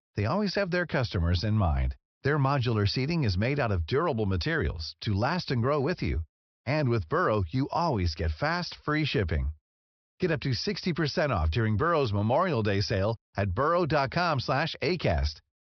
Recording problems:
high frequencies cut off; noticeable; nothing above 5.5 kHz

